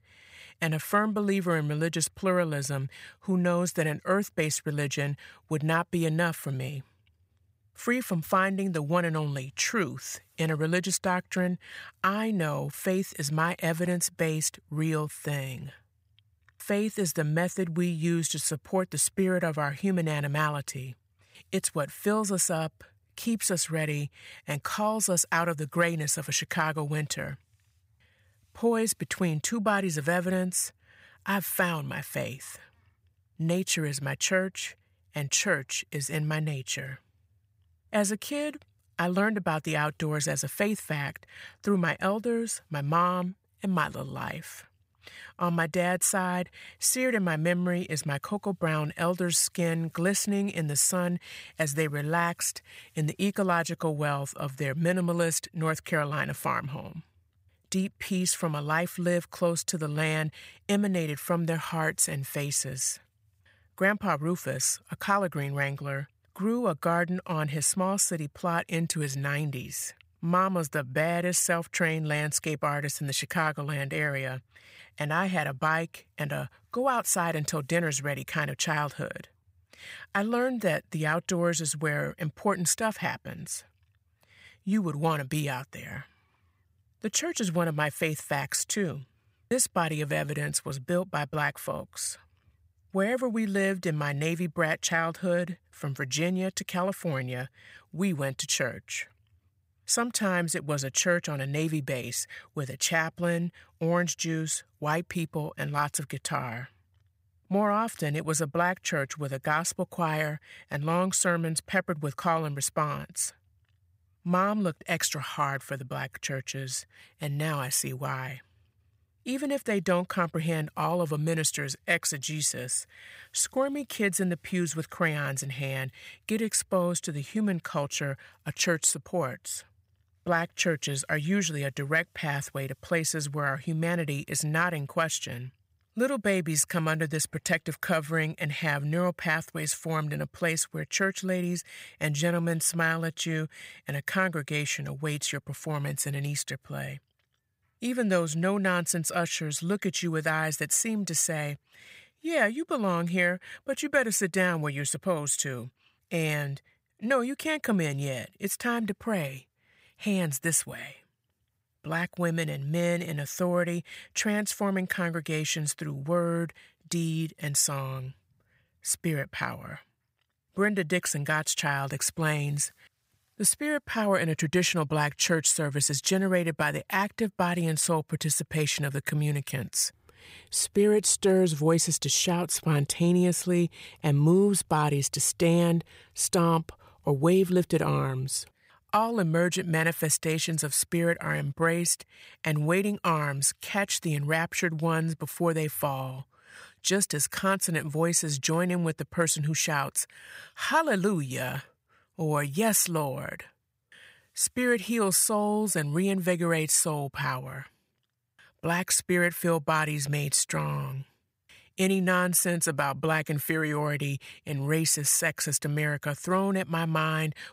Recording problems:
none

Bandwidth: 15.5 kHz